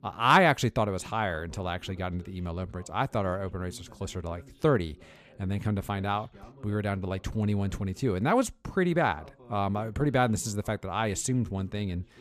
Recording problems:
voice in the background; faint; throughout; 25 dB below the speech

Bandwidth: 14.5 kHz